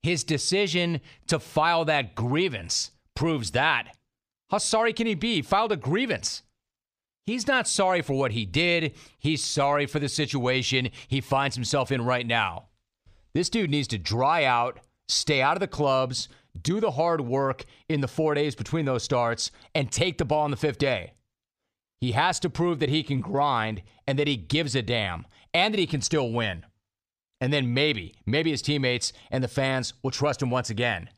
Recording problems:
none

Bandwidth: 15 kHz